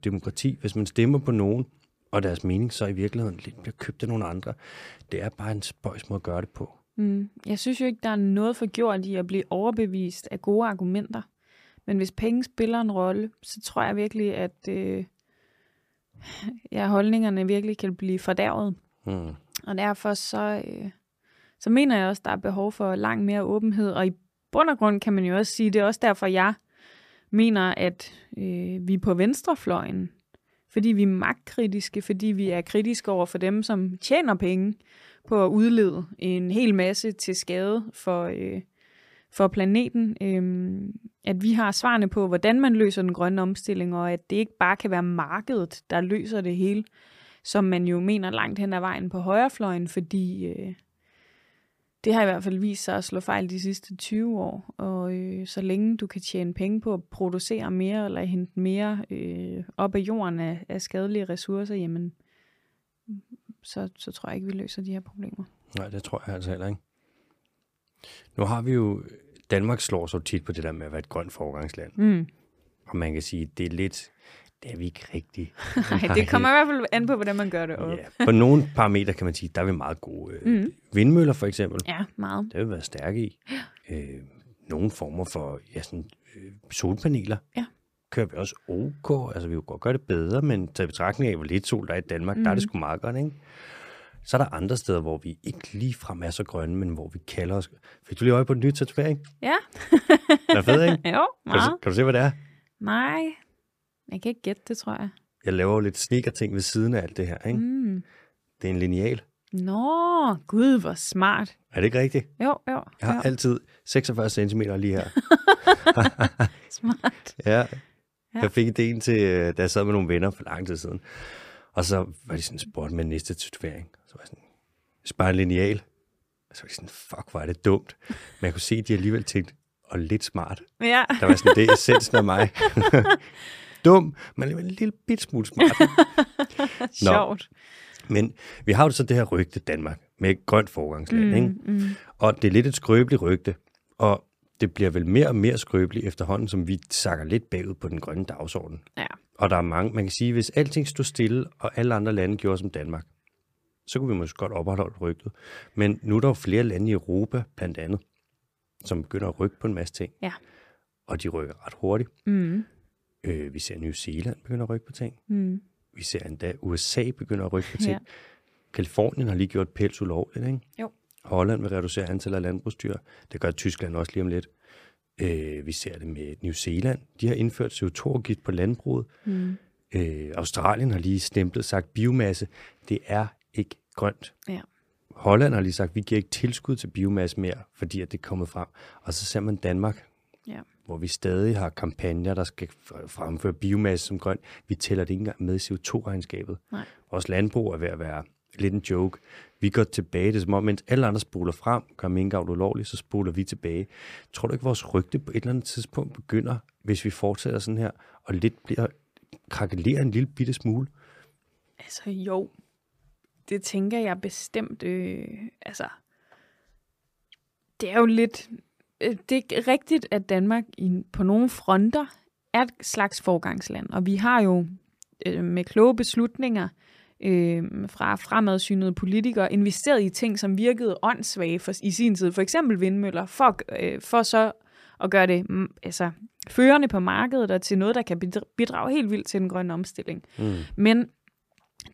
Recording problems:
none

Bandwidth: 15 kHz